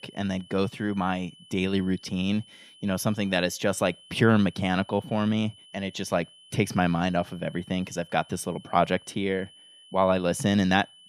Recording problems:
high-pitched whine; faint; throughout; 3 kHz, 25 dB below the speech

